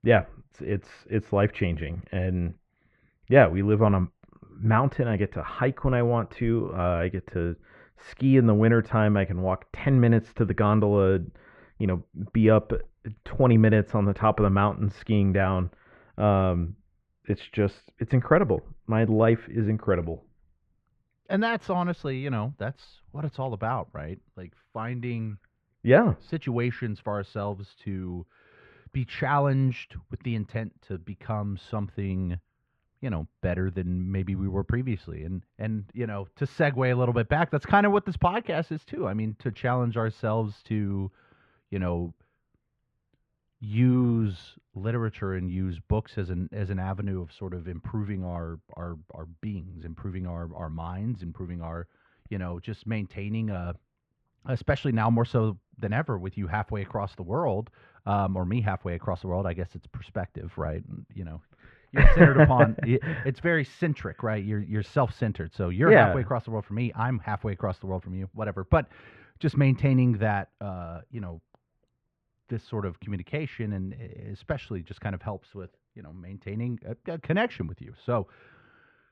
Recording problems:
muffled; very; fading above 2 kHz

